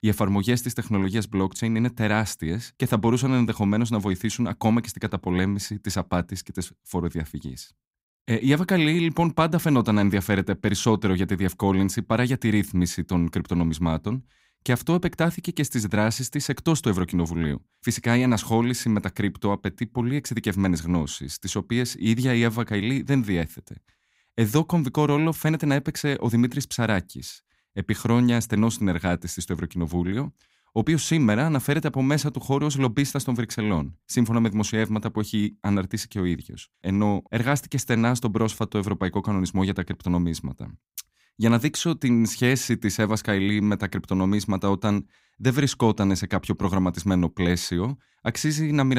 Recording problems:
abrupt cut into speech; at the end

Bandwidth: 15.5 kHz